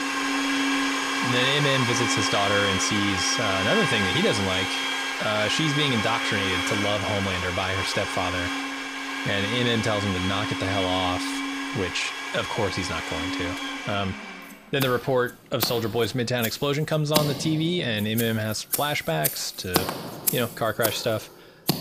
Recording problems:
household noises; loud; throughout; 1 dB below the speech

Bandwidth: 15.5 kHz